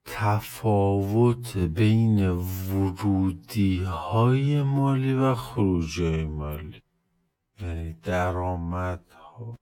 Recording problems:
wrong speed, natural pitch; too slow; 0.5 times normal speed

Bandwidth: 18 kHz